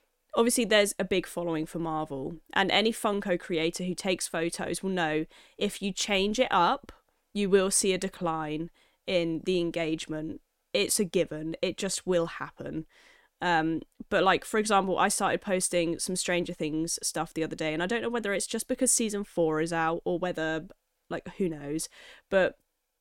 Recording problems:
none

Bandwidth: 16.5 kHz